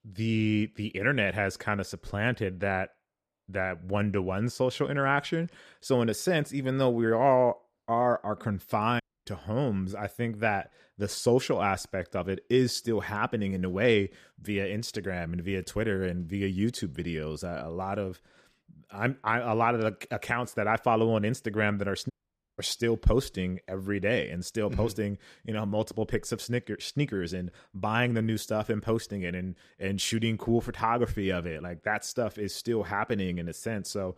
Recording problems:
audio cutting out; at 9 s and at 22 s

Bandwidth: 14.5 kHz